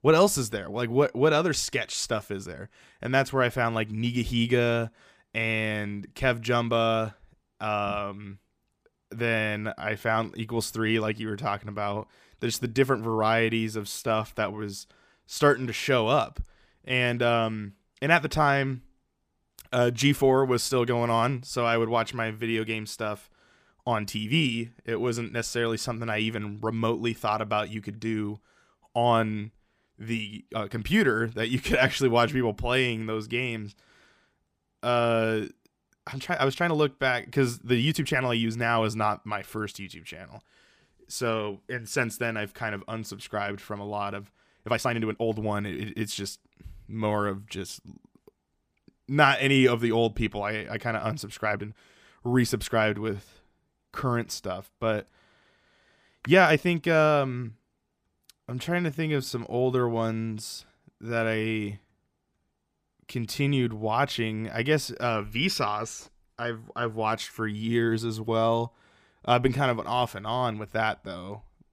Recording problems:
uneven, jittery; strongly; from 14 to 59 s

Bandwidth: 15 kHz